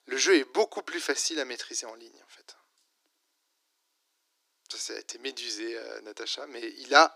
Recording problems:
thin; very; fading below 300 Hz

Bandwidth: 15 kHz